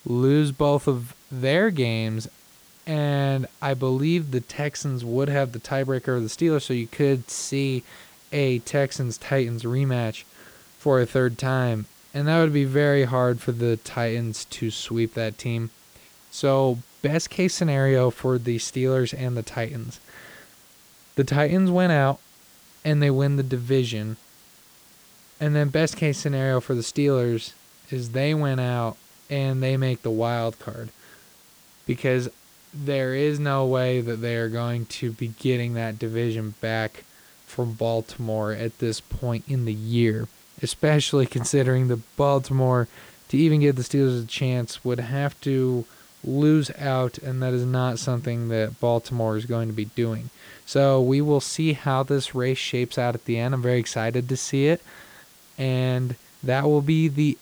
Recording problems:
hiss; faint; throughout; 25 dB below the speech

